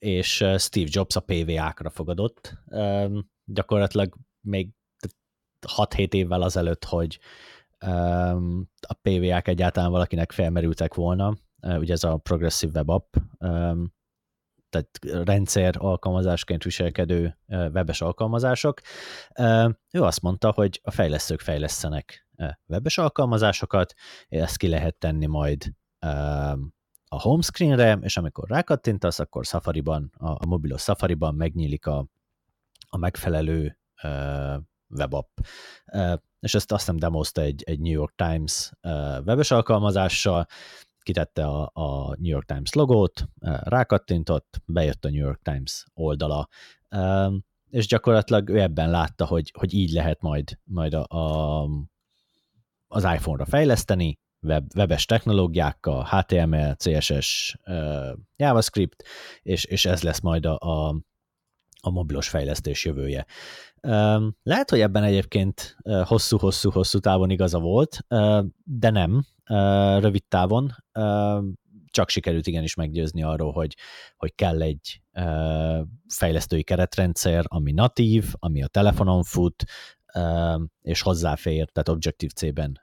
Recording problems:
none

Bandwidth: 17 kHz